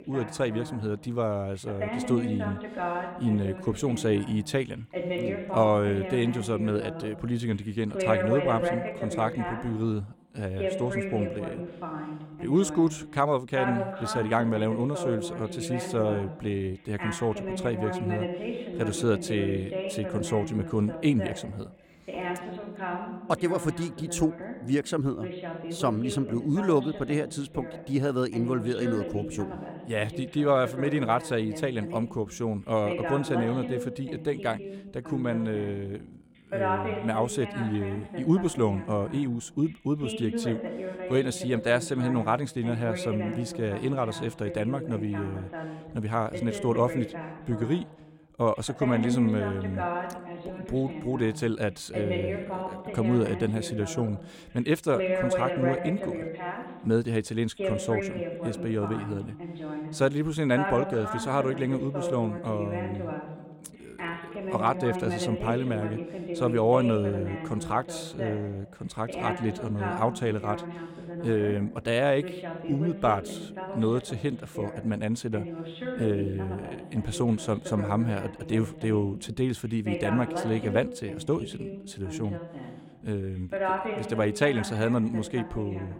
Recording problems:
voice in the background; loud; throughout; 6 dB below the speech

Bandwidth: 16.5 kHz